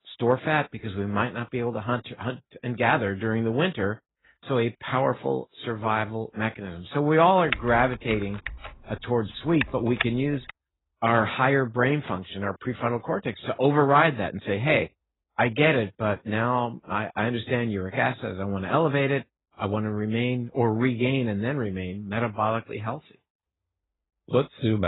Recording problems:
garbled, watery; badly; nothing above 4 kHz
keyboard typing; noticeable; from 7.5 to 11 s; peak 3 dB below the speech
abrupt cut into speech; at the end

